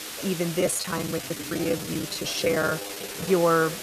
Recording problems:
hiss; loud; throughout; 8 dB below the speech
chatter from many people; noticeable; throughout; 15 dB below the speech
choppy; very; 13% of the speech affected

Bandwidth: 14.5 kHz